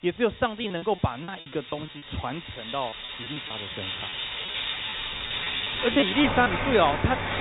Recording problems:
high frequencies cut off; severe; nothing above 4 kHz
rain or running water; loud; throughout; 3 dB below the speech
choppy; very; from 0.5 to 2 s, at 2.5 s and at 6 s; 16% of the speech affected
alarm; faint; from 5 to 6 s; peak 20 dB below the speech

